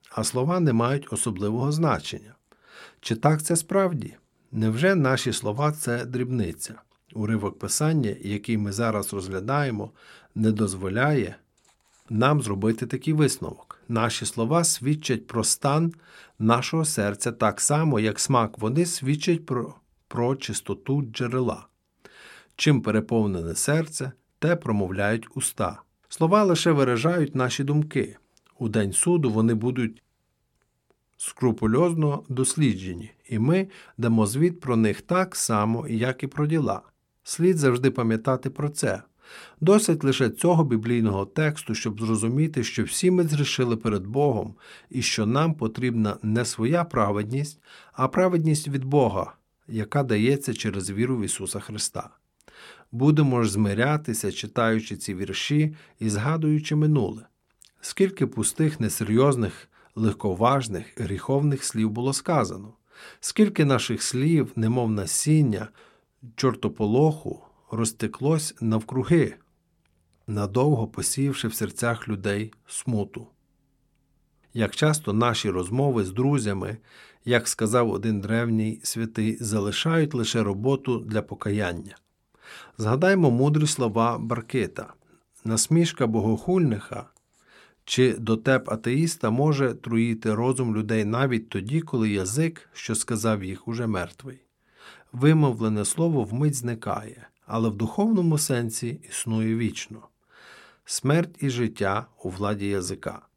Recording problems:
none

